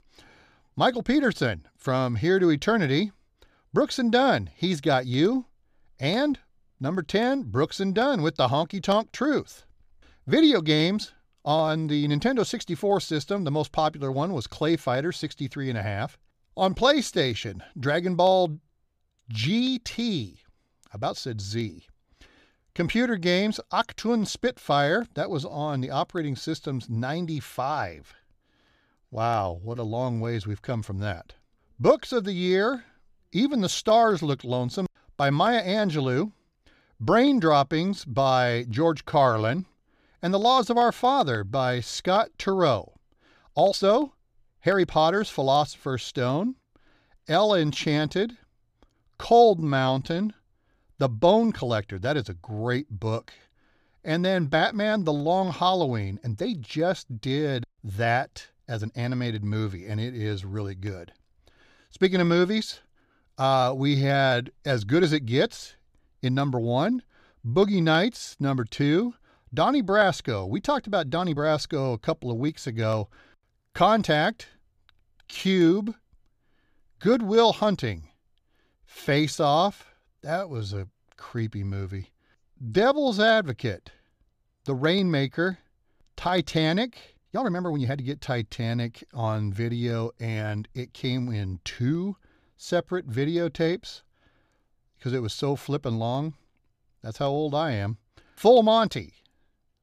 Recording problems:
uneven, jittery; strongly; from 11 s to 1:28

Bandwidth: 14.5 kHz